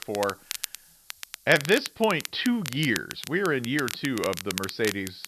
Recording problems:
high frequencies cut off; noticeable; nothing above 5.5 kHz
crackle, like an old record; loud; 9 dB below the speech
hiss; faint; throughout; 30 dB below the speech

